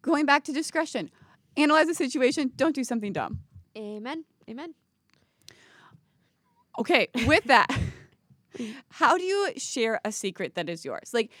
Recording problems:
none

